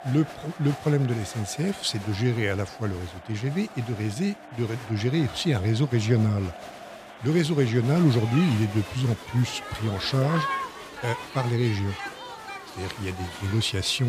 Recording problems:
crowd noise; noticeable; throughout; 10 dB below the speech
abrupt cut into speech; at the end

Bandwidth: 15 kHz